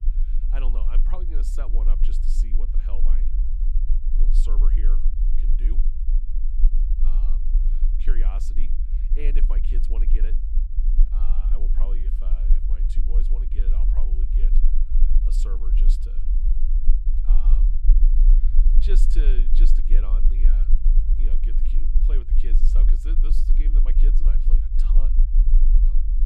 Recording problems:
low rumble; loud; throughout; 3 dB below the speech

